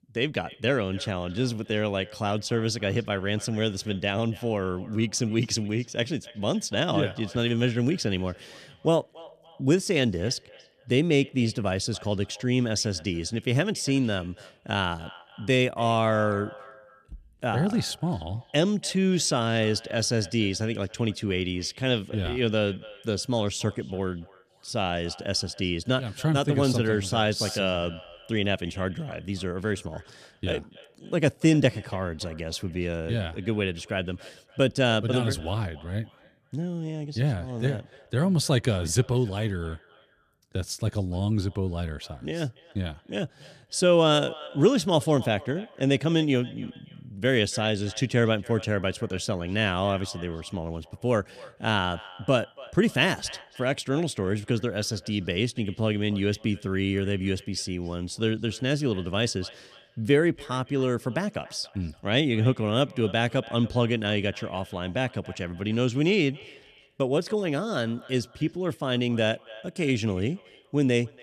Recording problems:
echo of what is said; faint; throughout; 280 ms later, 20 dB below the speech

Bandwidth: 14 kHz